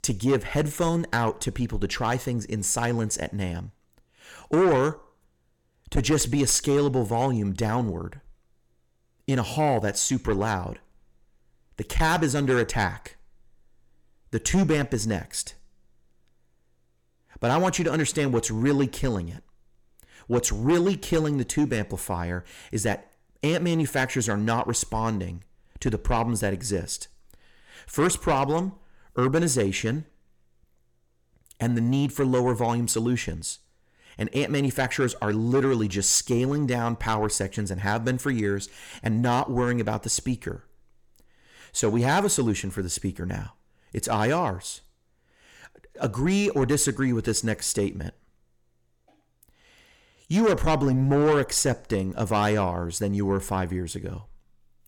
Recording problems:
distortion; slight; 10 dB below the speech

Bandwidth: 17 kHz